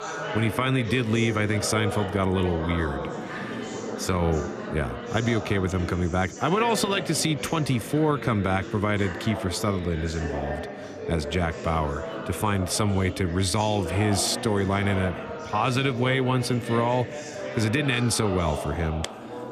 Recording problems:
background chatter; loud; throughout; 4 voices, 8 dB below the speech

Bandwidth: 14.5 kHz